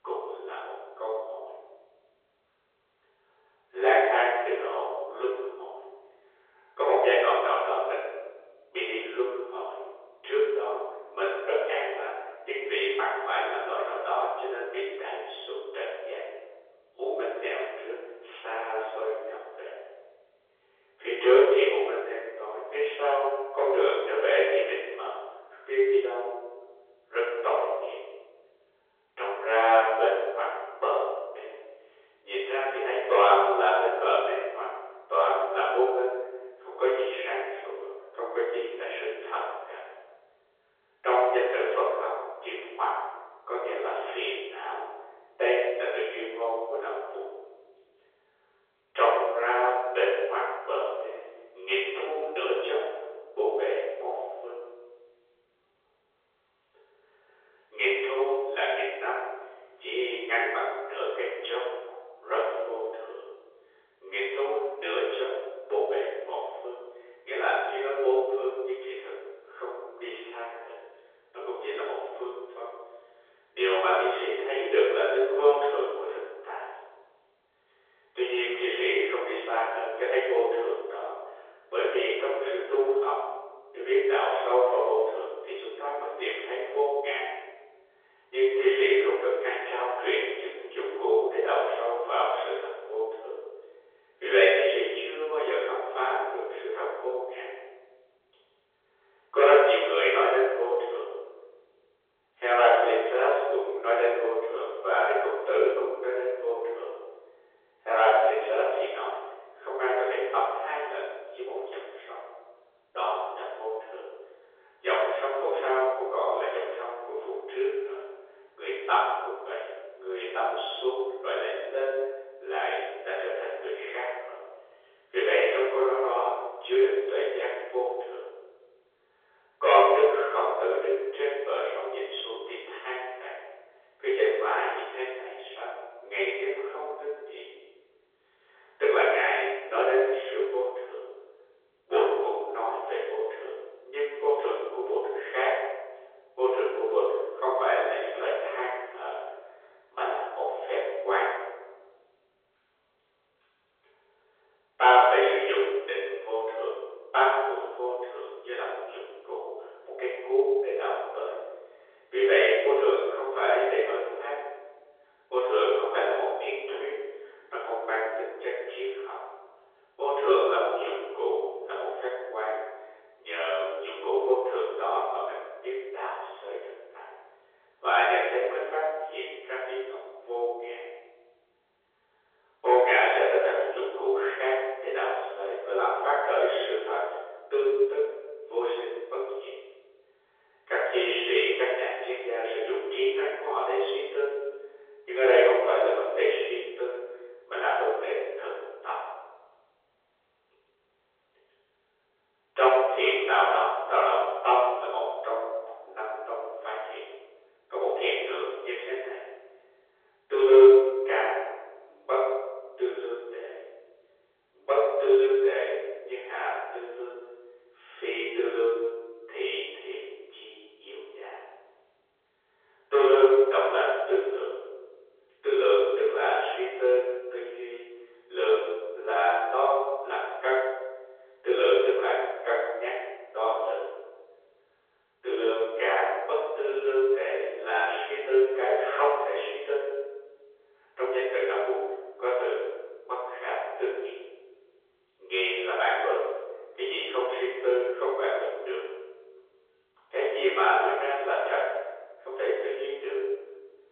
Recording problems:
room echo; strong; dies away in 1.1 s
off-mic speech; far
phone-call audio; nothing above 3.5 kHz

